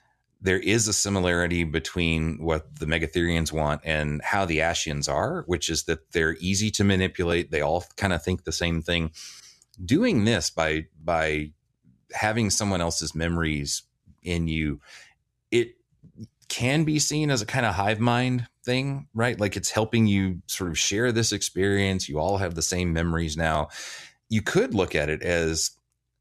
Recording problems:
none

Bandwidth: 13.5 kHz